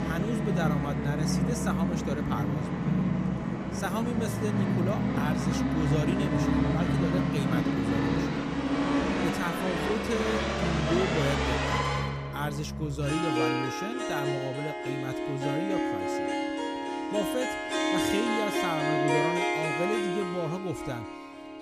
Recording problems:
background music; very loud; throughout; 5 dB above the speech

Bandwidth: 14.5 kHz